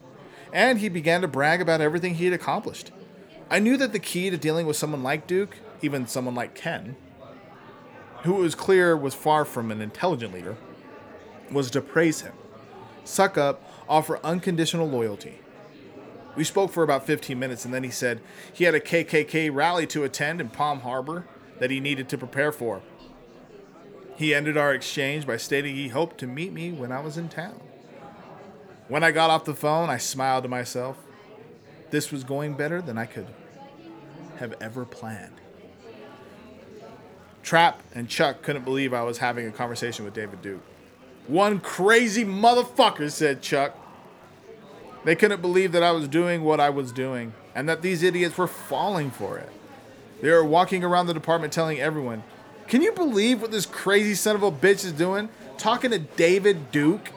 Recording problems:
murmuring crowd; faint; throughout; 20 dB below the speech

